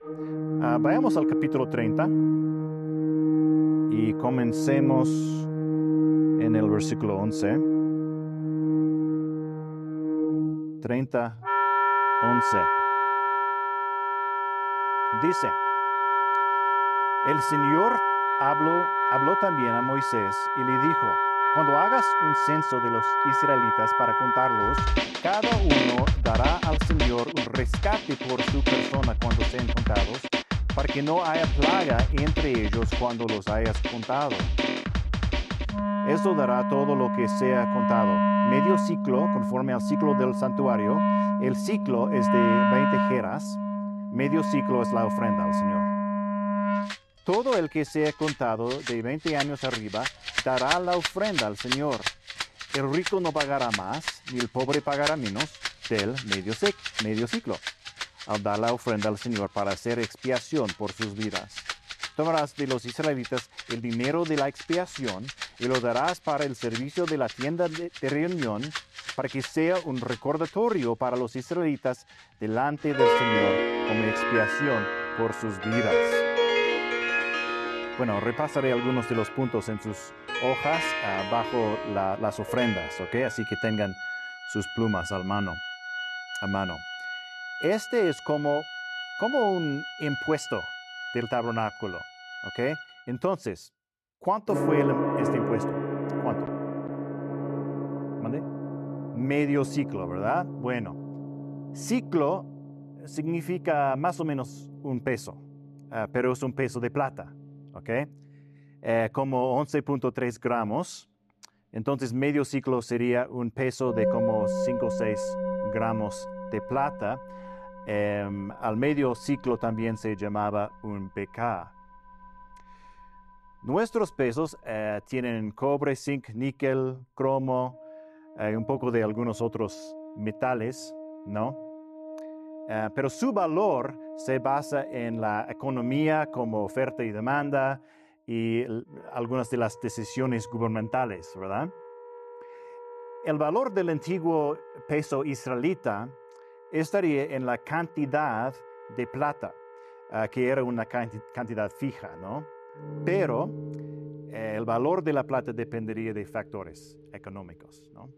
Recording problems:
background music; very loud; throughout; 2 dB above the speech

